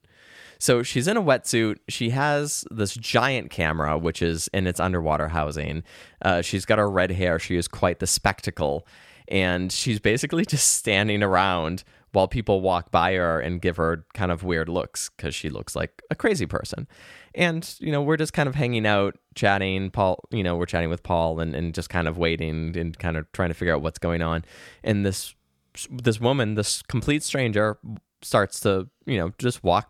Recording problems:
none

